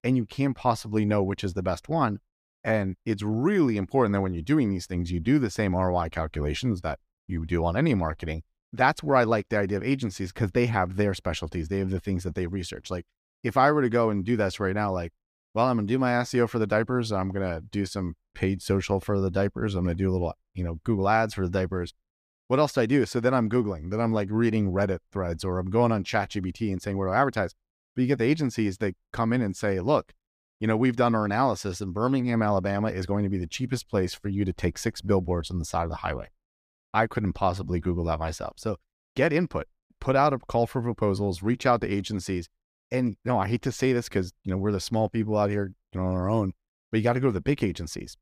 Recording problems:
none

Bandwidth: 15 kHz